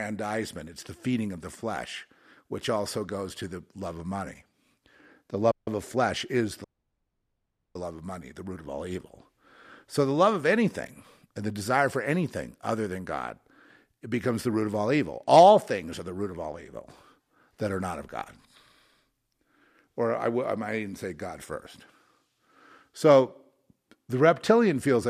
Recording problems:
abrupt cut into speech; at the start and the end
audio cutting out; at 5.5 s and at 6.5 s for 1 s

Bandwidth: 14.5 kHz